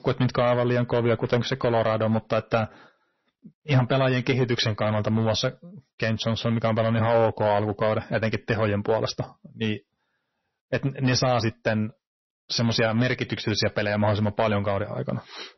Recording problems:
distortion; slight; 4% of the sound clipped
garbled, watery; slightly; nothing above 6 kHz

